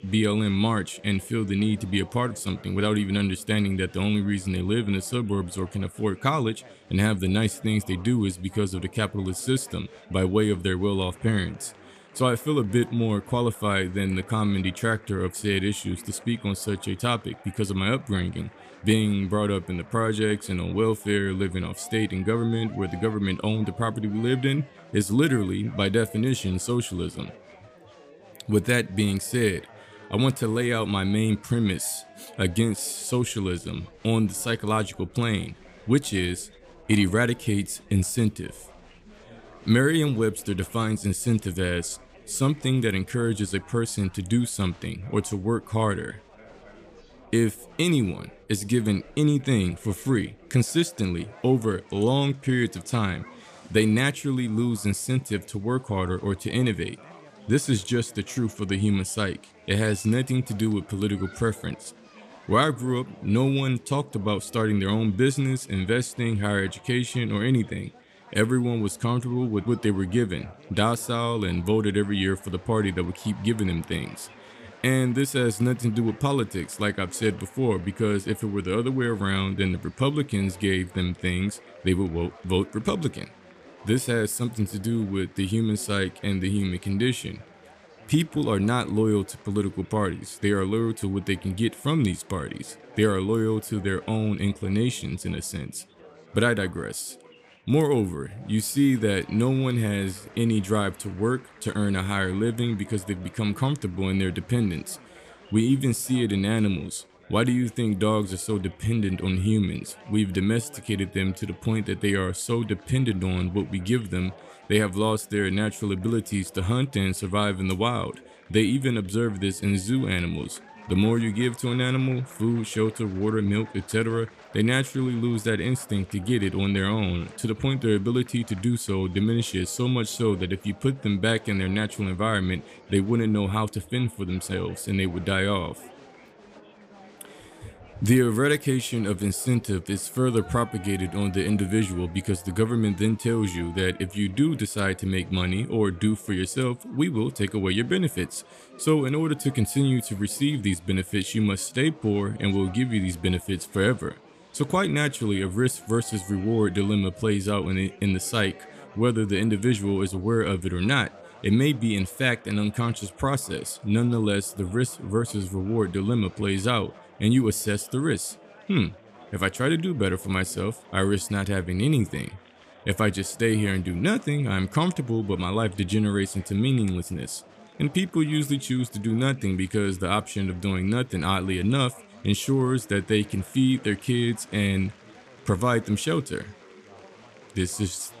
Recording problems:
chatter from many people; faint; throughout; 25 dB below the speech

